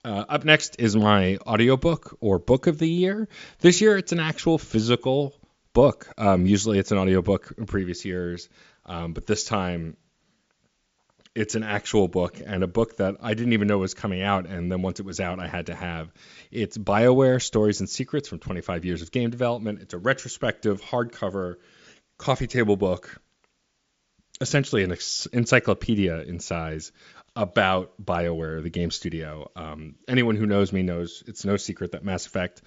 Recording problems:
high frequencies cut off; noticeable; nothing above 7.5 kHz

